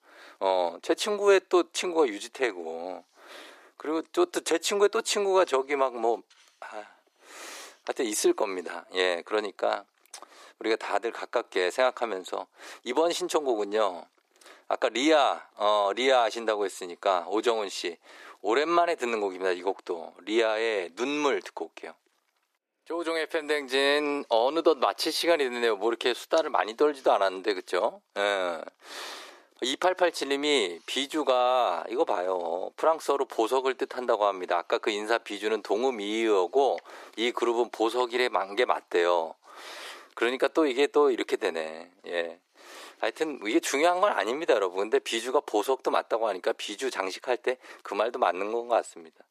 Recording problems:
thin; very; fading below 350 Hz

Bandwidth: 14.5 kHz